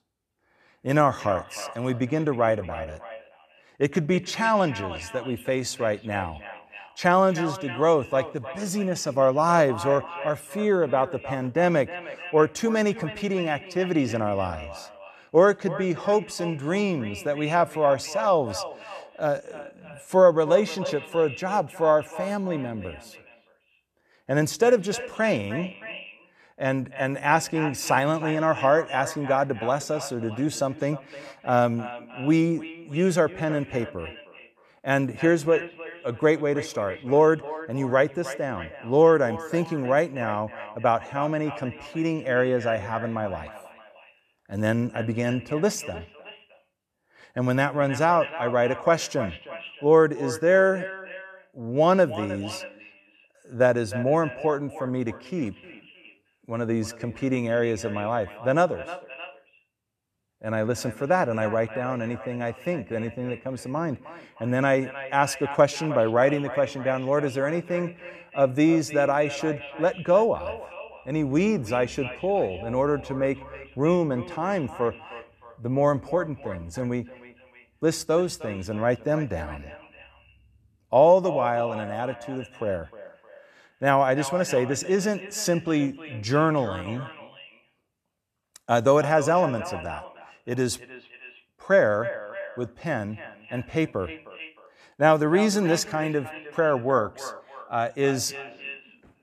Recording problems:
echo of what is said; noticeable; throughout; 310 ms later, 15 dB below the speech

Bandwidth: 14 kHz